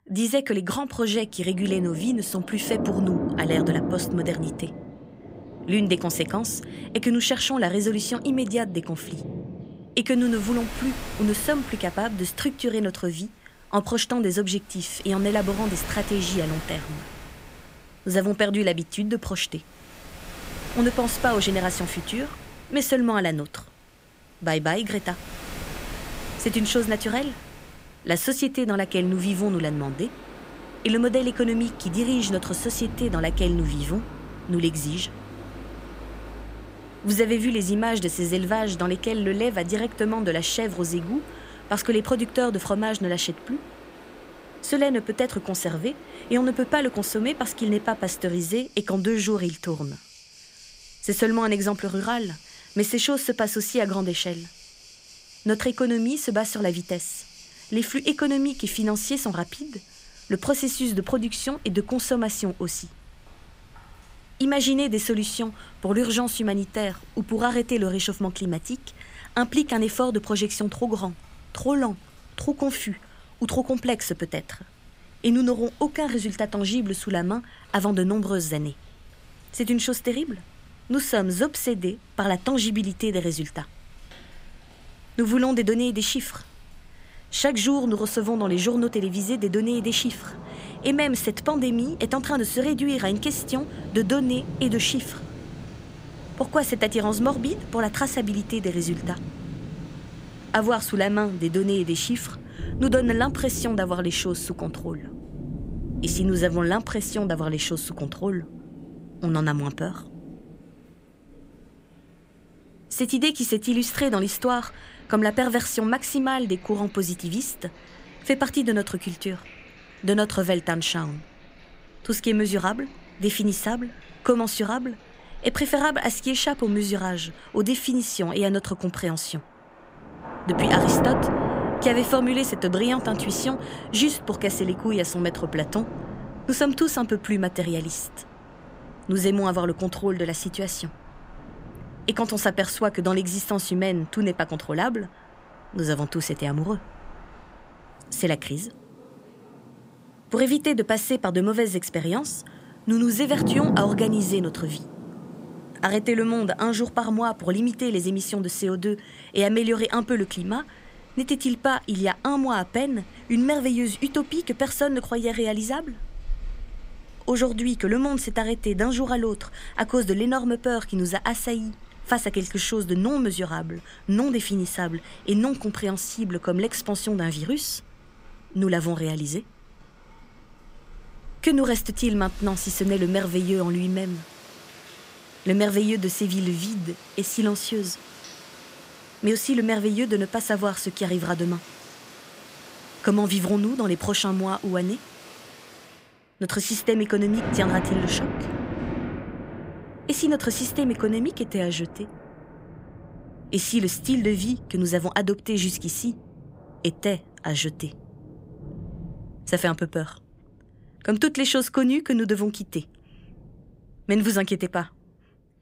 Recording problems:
rain or running water; noticeable; throughout; 10 dB below the speech

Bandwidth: 15.5 kHz